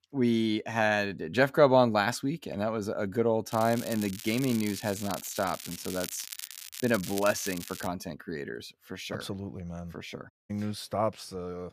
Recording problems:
crackling; noticeable; from 3.5 to 8 s; 10 dB below the speech
audio cutting out; at 10 s

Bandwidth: 15 kHz